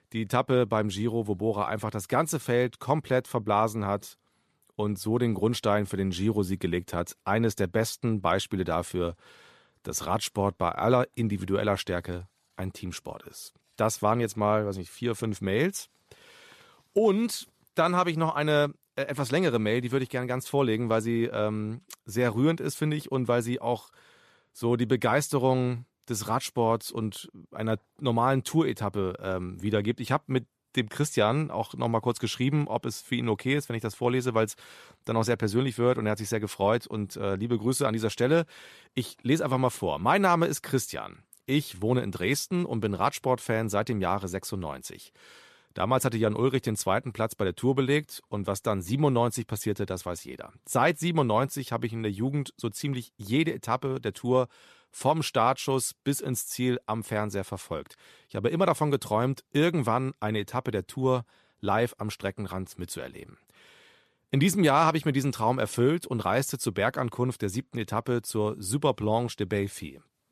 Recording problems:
none

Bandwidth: 14 kHz